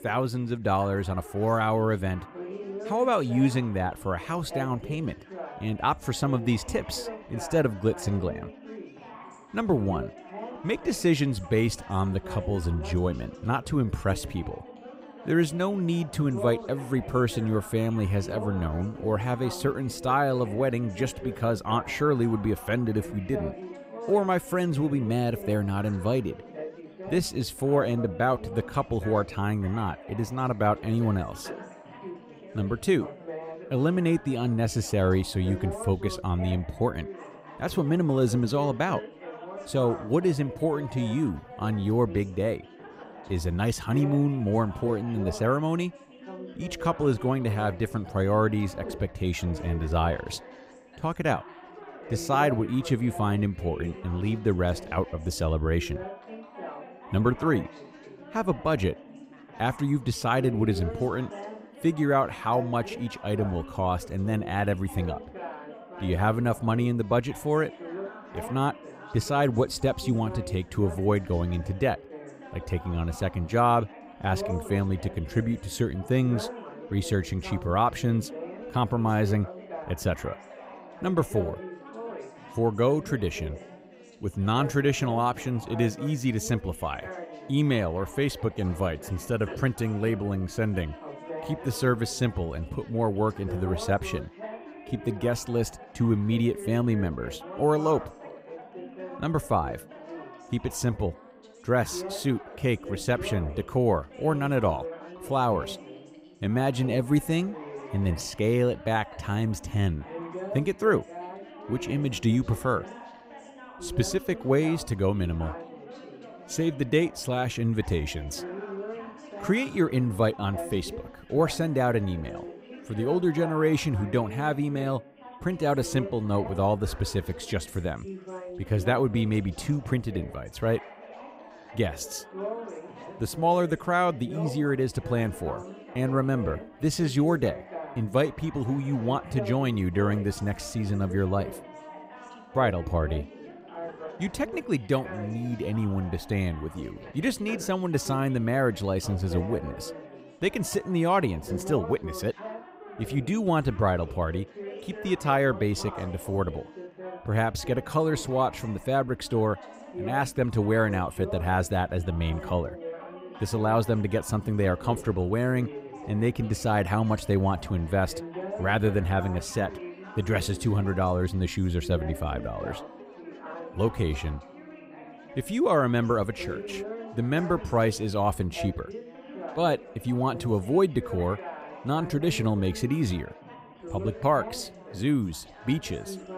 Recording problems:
background chatter; noticeable; throughout; 4 voices, 15 dB below the speech

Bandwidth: 15.5 kHz